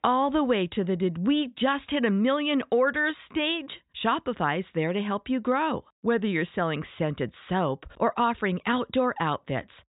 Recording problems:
high frequencies cut off; severe; nothing above 4 kHz

